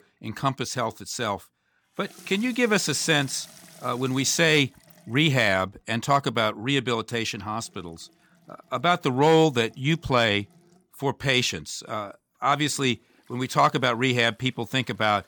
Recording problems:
household noises; faint; throughout; 25 dB below the speech

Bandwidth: 18.5 kHz